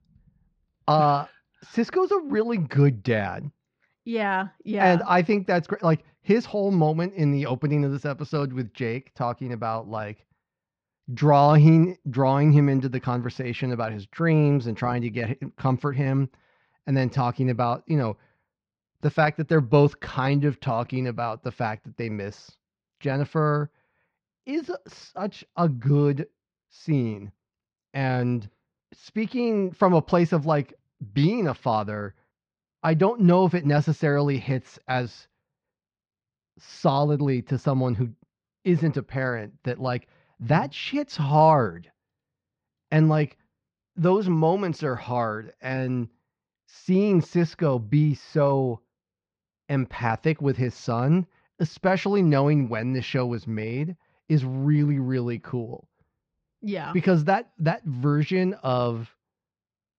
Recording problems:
muffled; slightly; fading above 4 kHz

